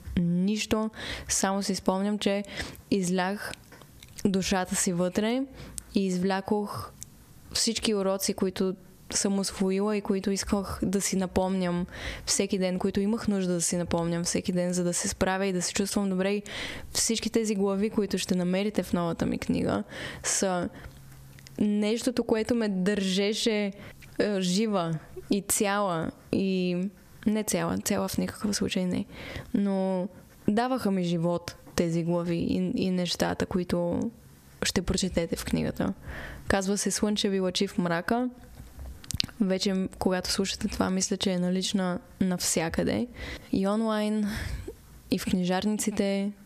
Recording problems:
squashed, flat; heavily

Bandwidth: 14.5 kHz